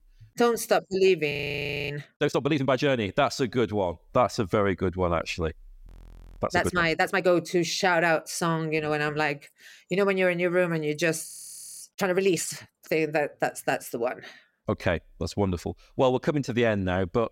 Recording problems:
audio freezing; at 1.5 s for 0.5 s, at 6 s for 0.5 s and at 11 s for 0.5 s

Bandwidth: 16 kHz